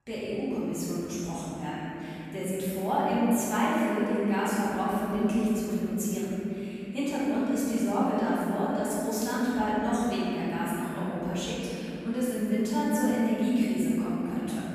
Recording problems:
room echo; strong; dies away in 3 s
off-mic speech; far

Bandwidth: 14.5 kHz